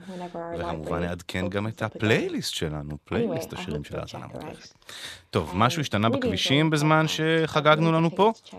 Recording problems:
voice in the background; noticeable; throughout; 10 dB below the speech

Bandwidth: 13.5 kHz